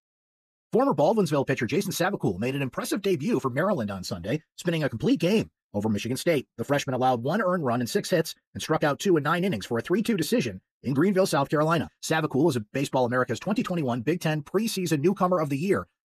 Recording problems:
wrong speed, natural pitch; too fast; 1.5 times normal speed

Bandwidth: 14 kHz